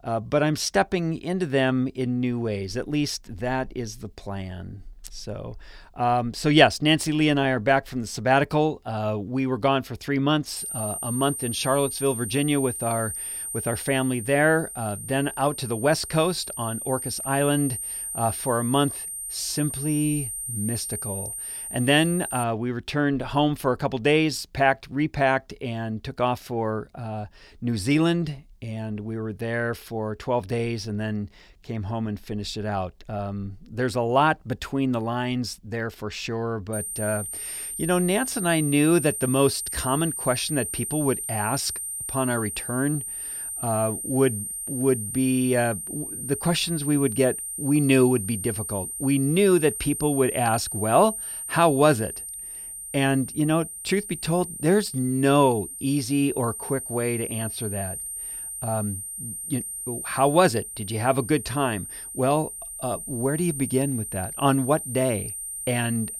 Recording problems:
high-pitched whine; loud; from 11 to 22 s and from 37 s on; 9 kHz, 6 dB below the speech

